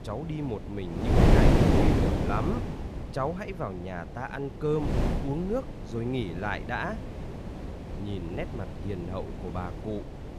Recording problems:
wind noise on the microphone; heavy; 1 dB above the speech

